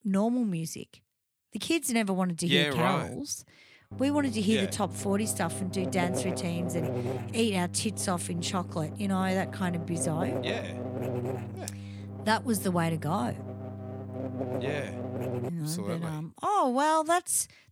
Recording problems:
electrical hum; loud; from 4 to 15 s; 50 Hz, 10 dB below the speech

